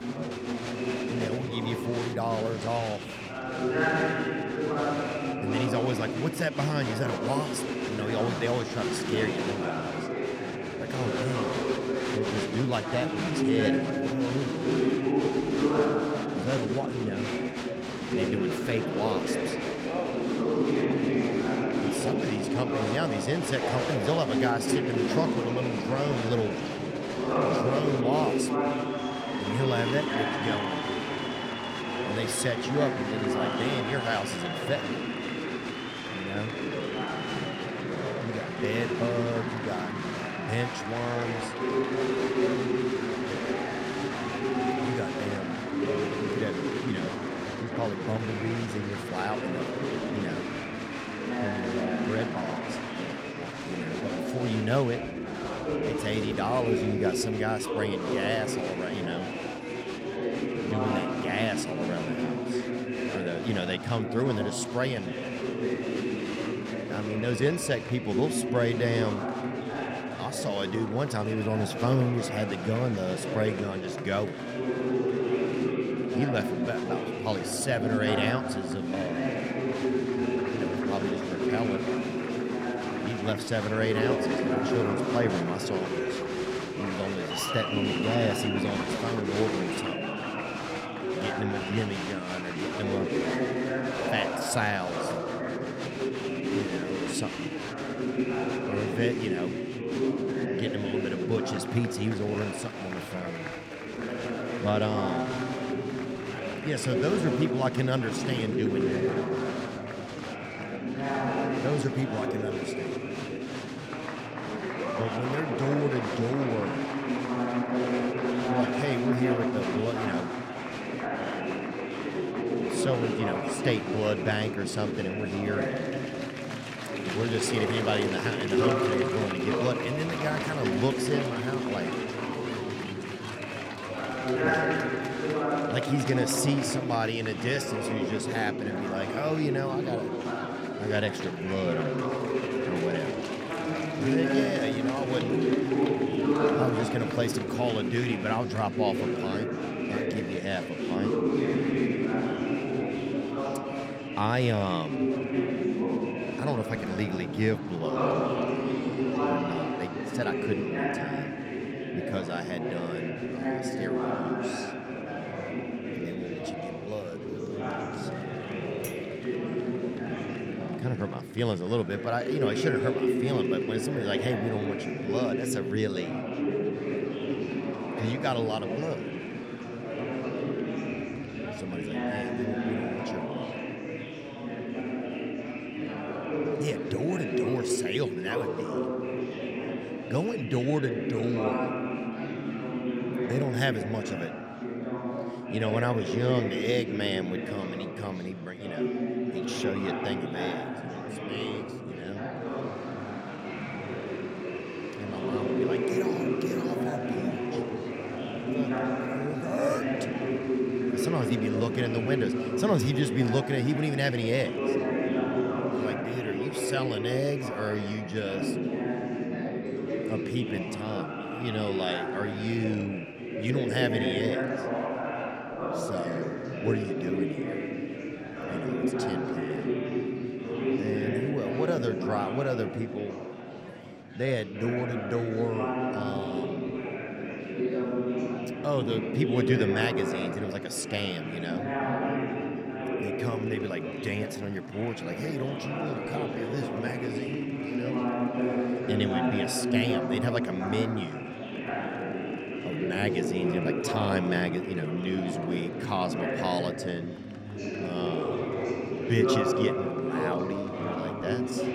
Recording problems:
chatter from many people; very loud; throughout; 1 dB above the speech
clattering dishes; faint; at 2:49; peak 10 dB below the speech

